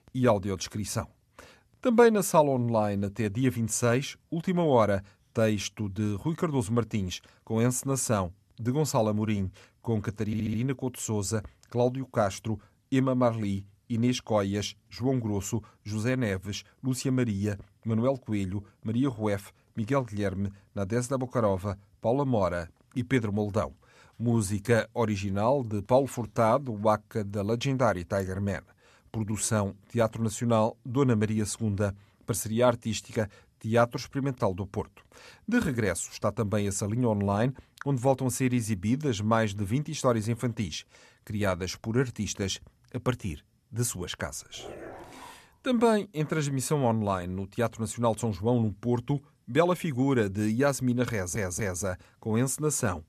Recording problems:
audio stuttering; at 10 s and at 51 s
dog barking; faint; at 45 s; peak 15 dB below the speech

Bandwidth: 13.5 kHz